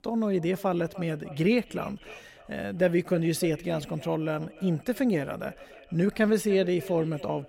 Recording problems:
echo of what is said; faint; throughout; 300 ms later, 20 dB below the speech

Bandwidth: 16 kHz